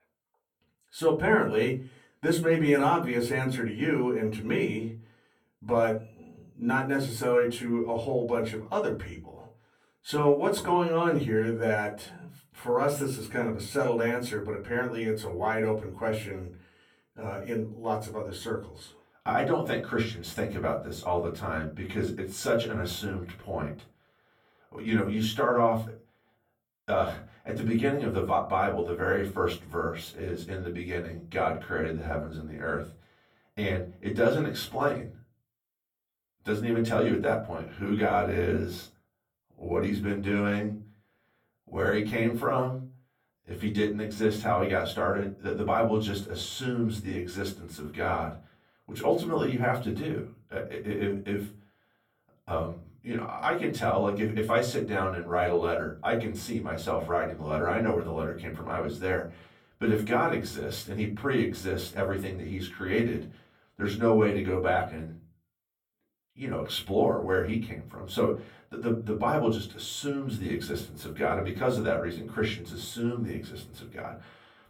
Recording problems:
off-mic speech; far
room echo; very slight; dies away in 0.3 s

